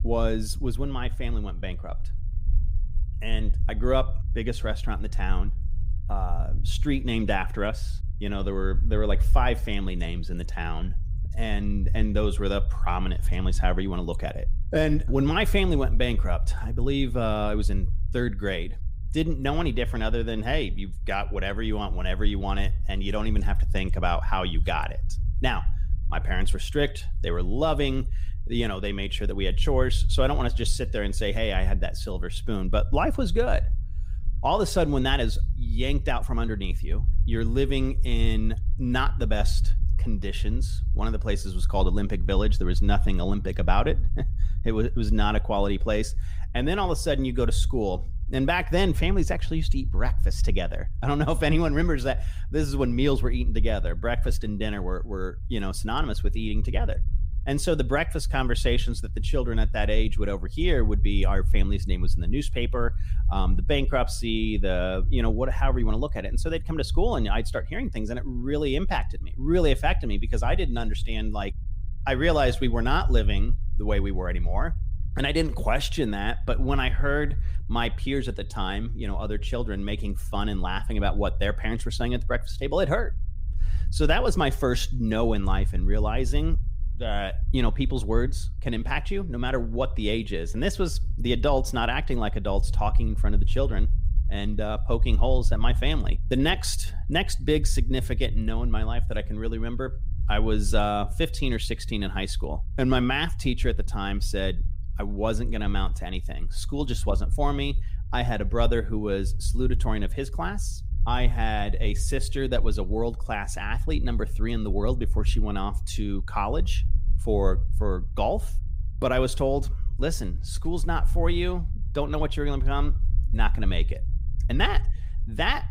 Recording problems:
low rumble; faint; throughout; 20 dB below the speech

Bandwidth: 15.5 kHz